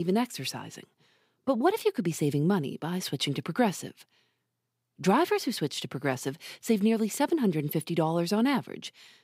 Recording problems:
abrupt cut into speech; at the start

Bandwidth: 15.5 kHz